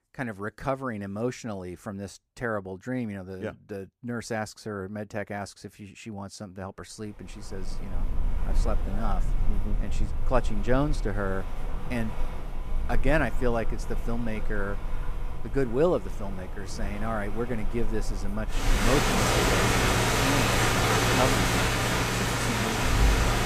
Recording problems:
rain or running water; very loud; from 7.5 s on; 4 dB above the speech

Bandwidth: 15 kHz